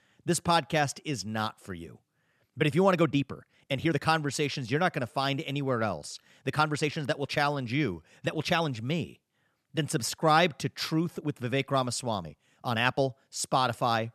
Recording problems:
uneven, jittery; strongly; from 3 to 13 s

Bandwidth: 13.5 kHz